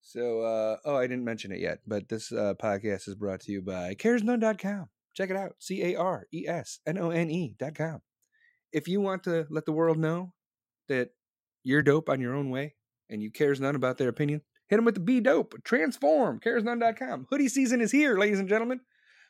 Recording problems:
none

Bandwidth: 16 kHz